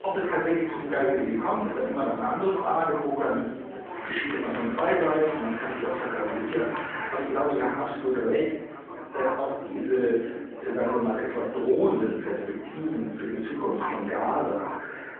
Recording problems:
off-mic speech; far
muffled; very; fading above 2.5 kHz
room echo; noticeable; dies away in 1 s
phone-call audio
chatter from many people; loud; throughout; 9 dB below the speech

